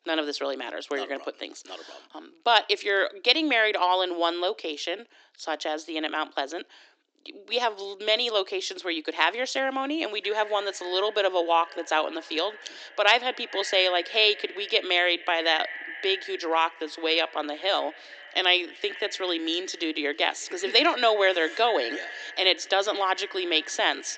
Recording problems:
echo of what is said; noticeable; from 10 s on; 210 ms later, 15 dB below the speech
thin; somewhat; fading below 300 Hz
high frequencies cut off; noticeable; nothing above 8 kHz

